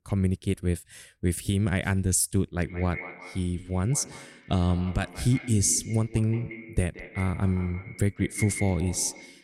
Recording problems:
echo of what is said; noticeable; from 2.5 s on; 170 ms later, 15 dB below the speech

